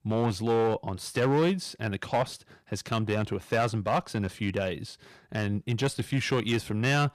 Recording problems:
distortion; slight; 5% of the sound clipped

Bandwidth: 14.5 kHz